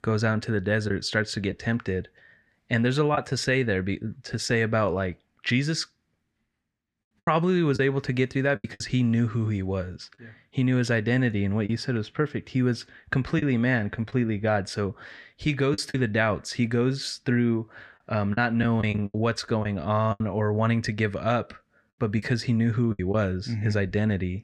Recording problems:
choppy; occasionally; 4% of the speech affected

